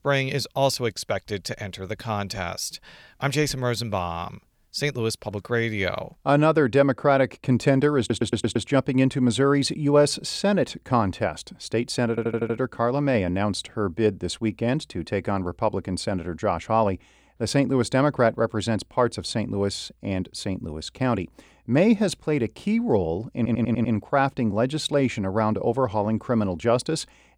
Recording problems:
audio stuttering; at 8 s, at 12 s and at 23 s

